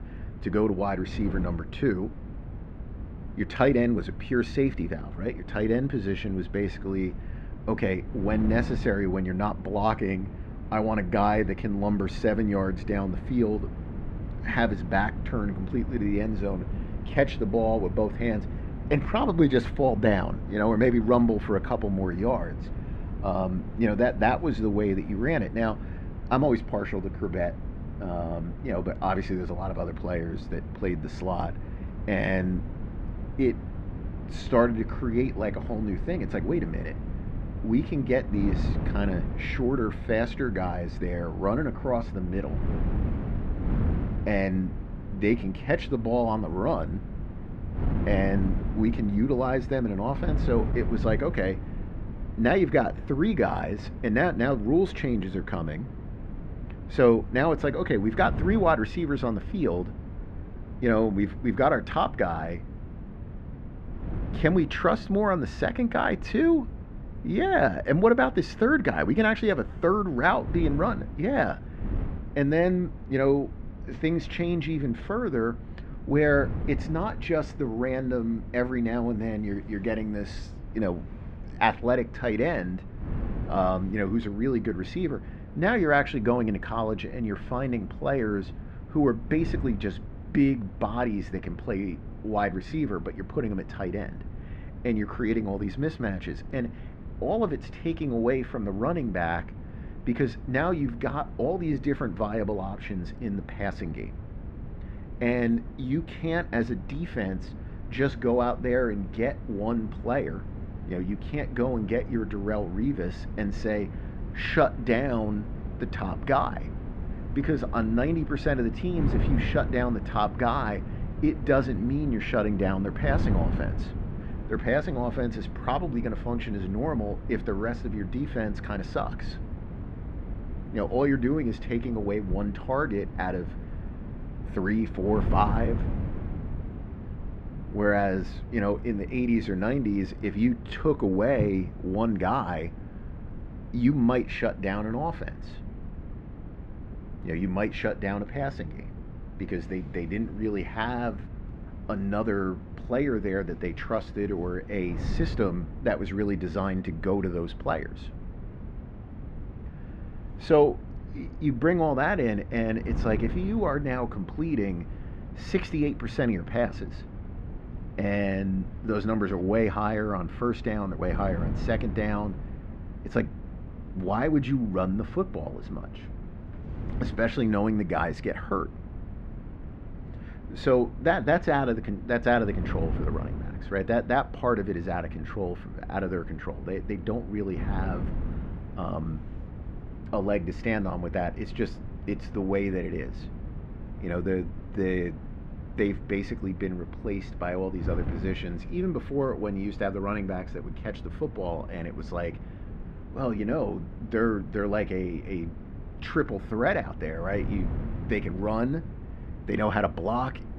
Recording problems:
muffled; very; fading above 2 kHz
wind noise on the microphone; occasional gusts; 15 dB below the speech

